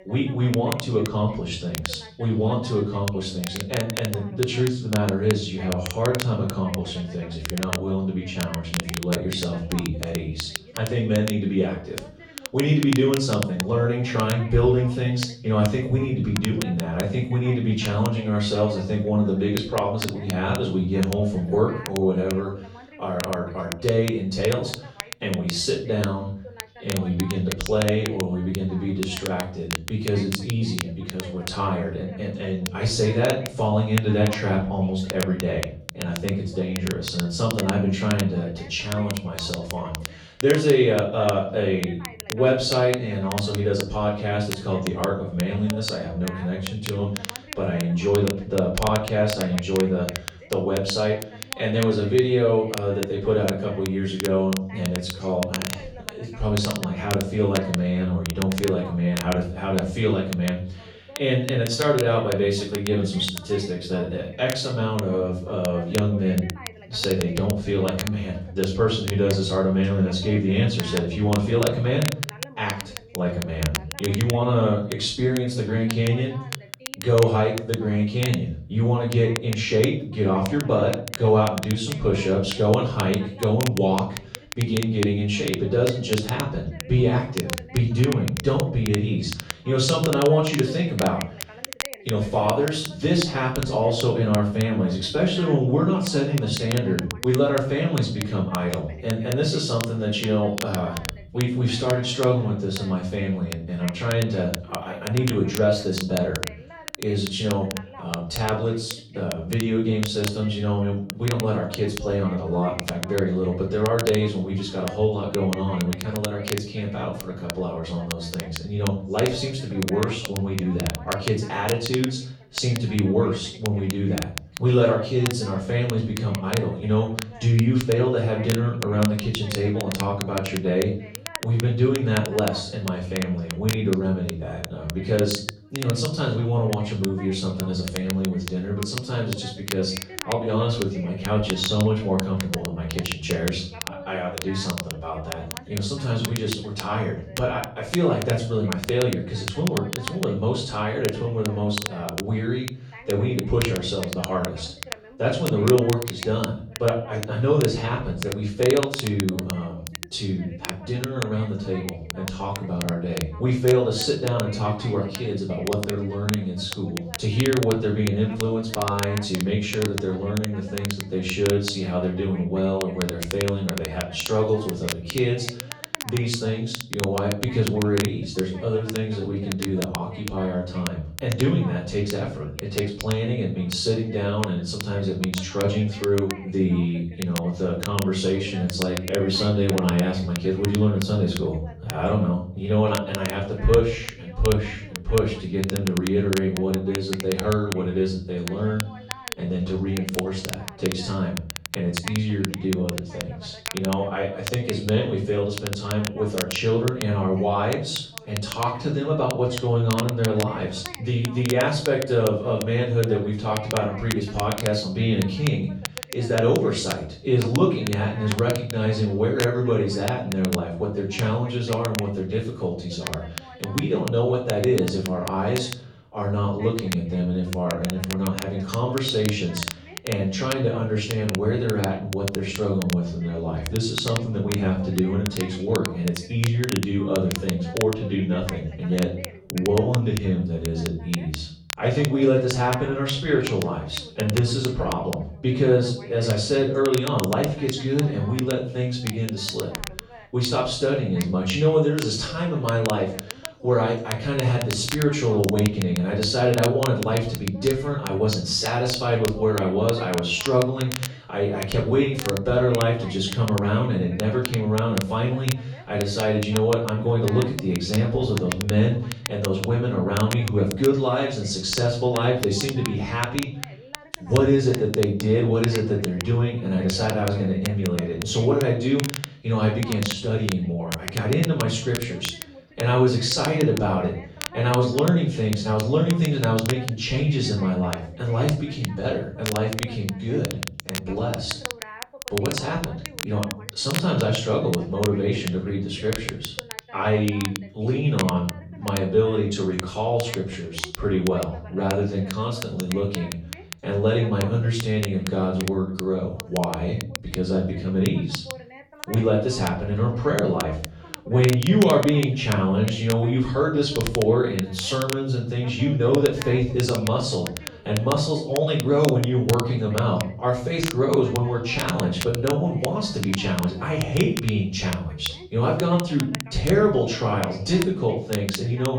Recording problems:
off-mic speech; far
room echo; noticeable; dies away in 0.5 s
voice in the background; faint; throughout; 20 dB below the speech
crackle, like an old record; very faint; 10 dB below the speech

